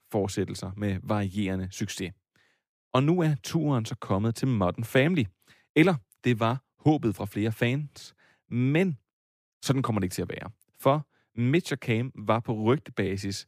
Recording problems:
none

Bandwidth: 15 kHz